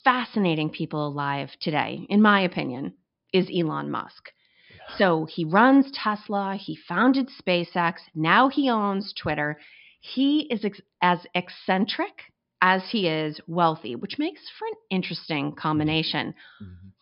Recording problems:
high frequencies cut off; noticeable; nothing above 5.5 kHz

